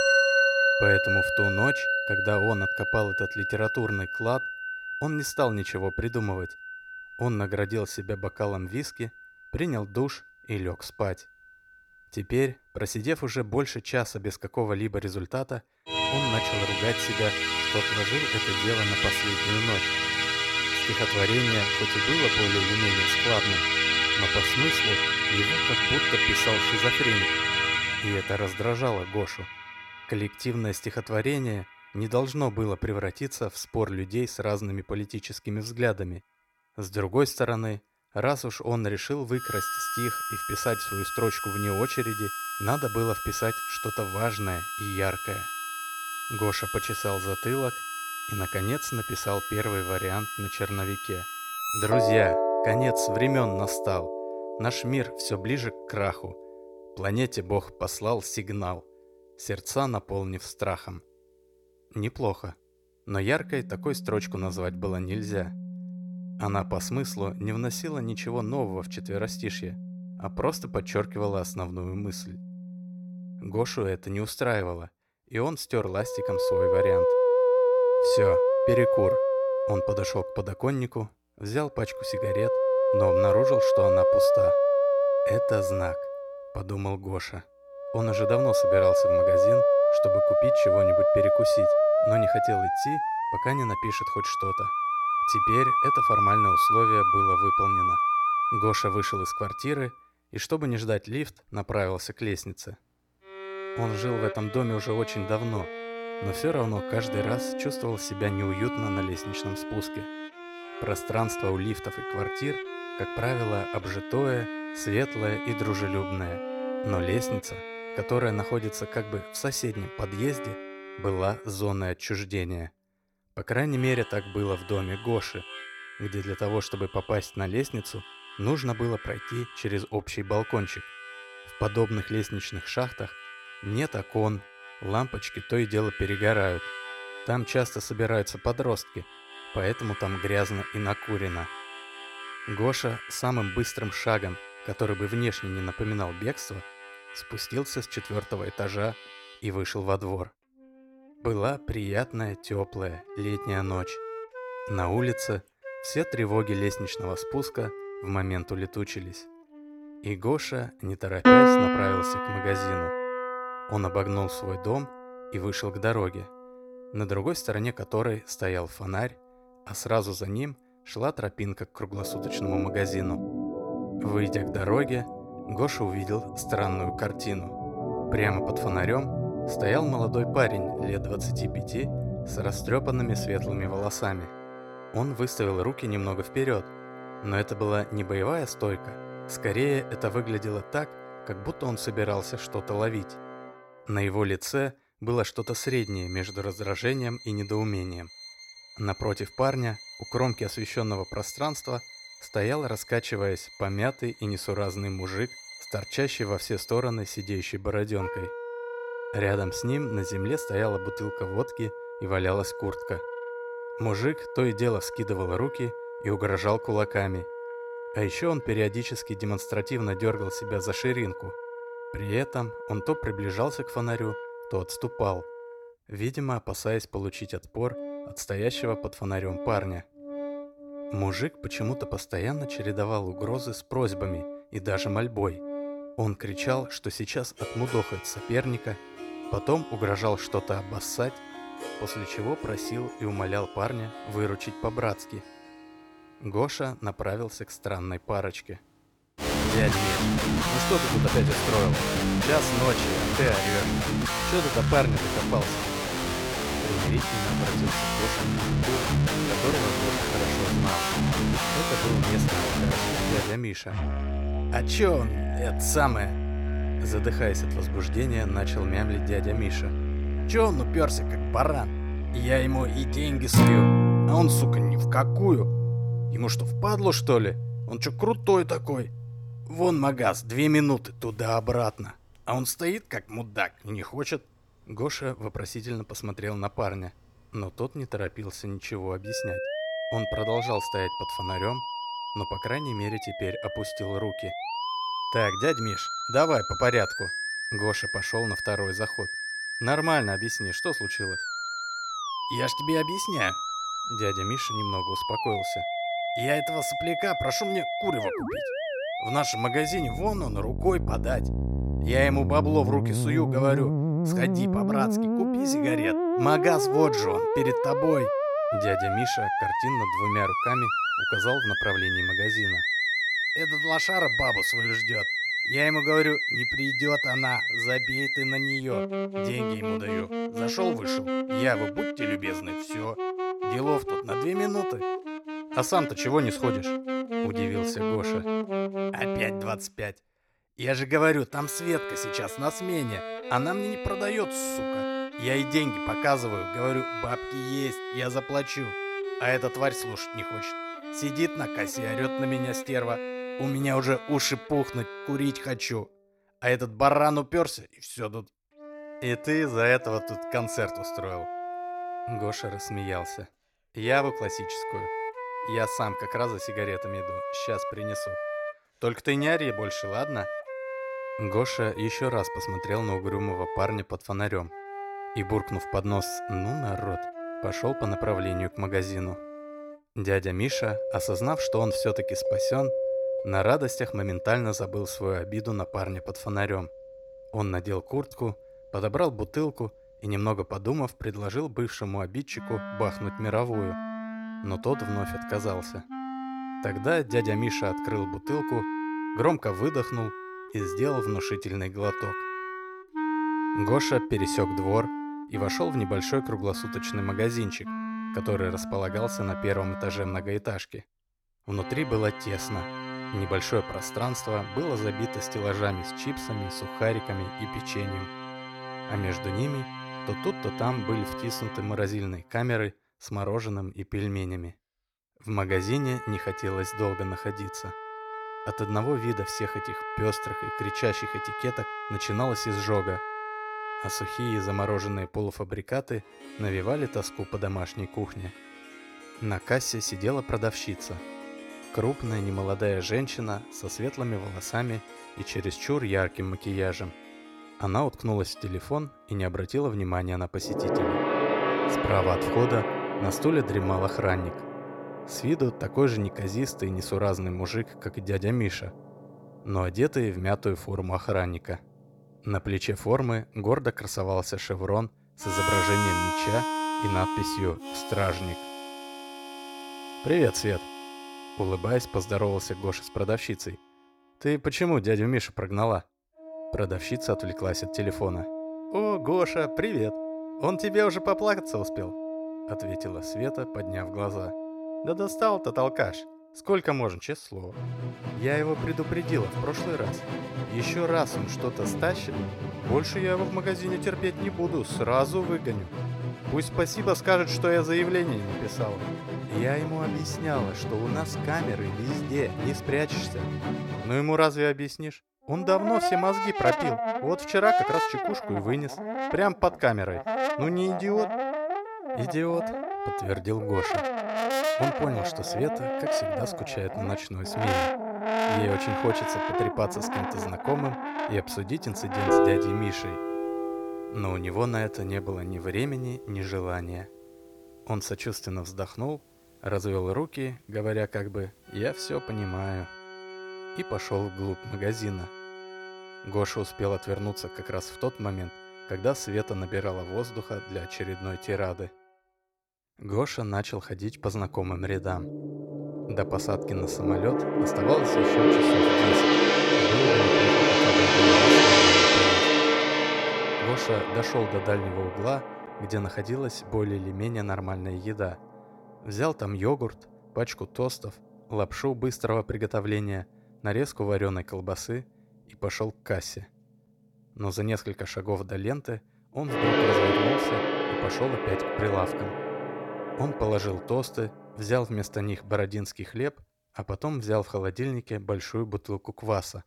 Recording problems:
background music; very loud; throughout; 2 dB above the speech

